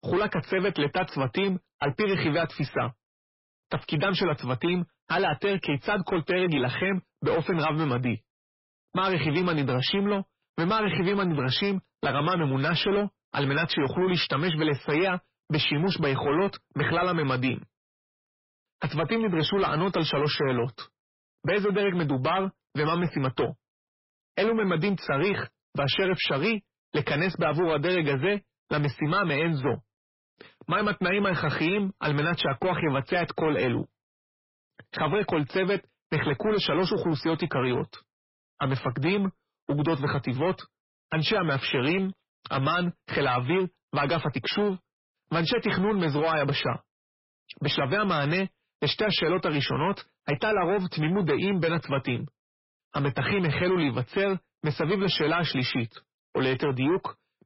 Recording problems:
distortion; heavy; 7 dB below the speech
garbled, watery; badly; nothing above 5.5 kHz

